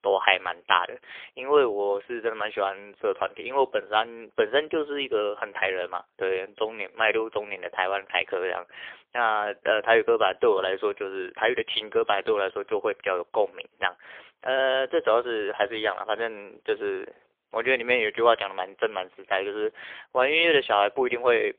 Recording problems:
phone-call audio; poor line; nothing above 3.5 kHz

